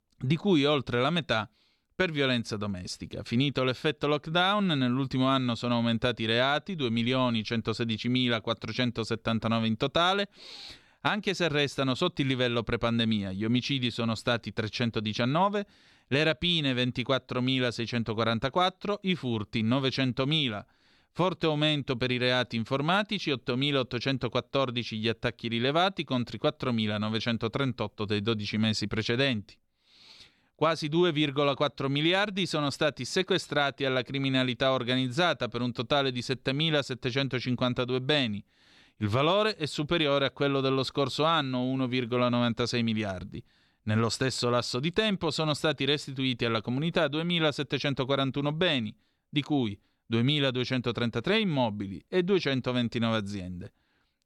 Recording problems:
none

